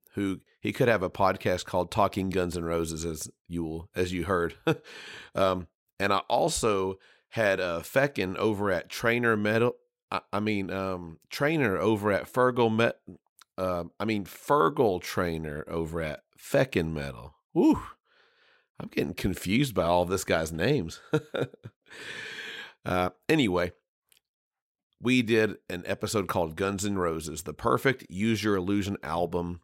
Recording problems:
none

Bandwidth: 16 kHz